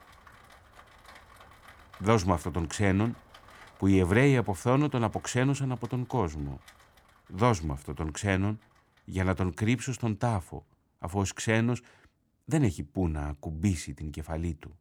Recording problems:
rain or running water; faint; throughout; 25 dB below the speech

